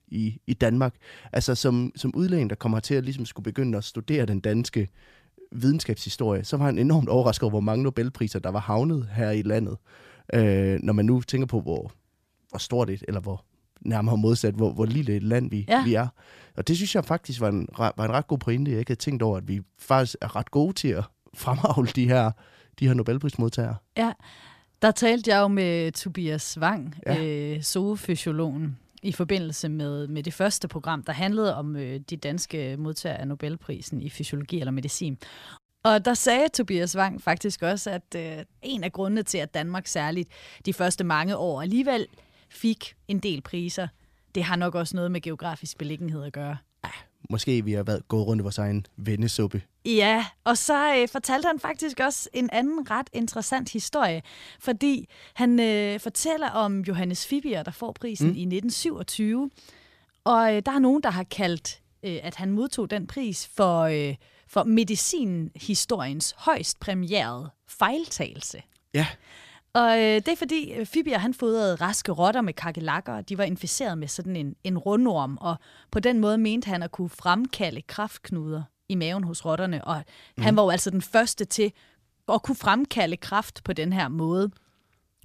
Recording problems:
none

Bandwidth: 14.5 kHz